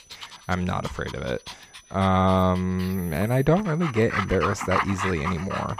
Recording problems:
animal sounds; loud; throughout; 7 dB below the speech
high-pitched whine; faint; throughout; 6 kHz, 30 dB below the speech

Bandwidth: 15 kHz